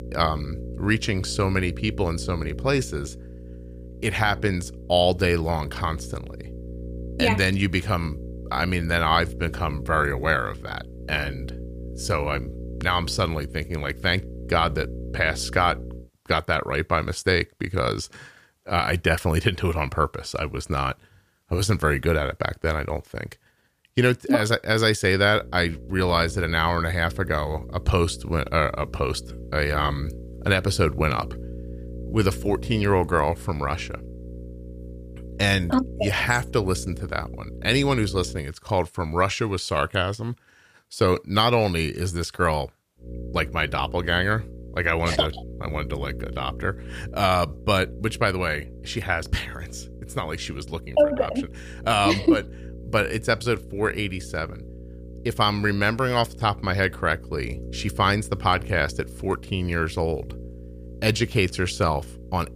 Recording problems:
electrical hum; faint; until 16 s, from 25 to 38 s and from 43 s on; 60 Hz, 20 dB below the speech

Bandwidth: 15 kHz